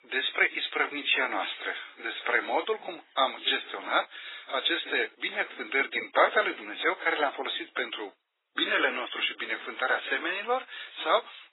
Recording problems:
garbled, watery; badly; nothing above 4 kHz
thin; very; fading below 400 Hz

